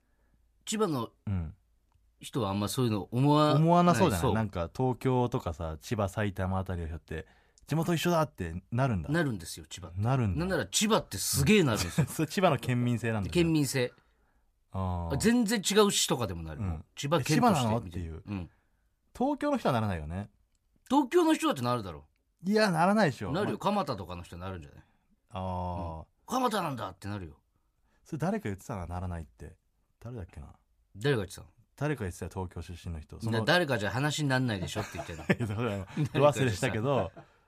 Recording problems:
none

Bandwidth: 14.5 kHz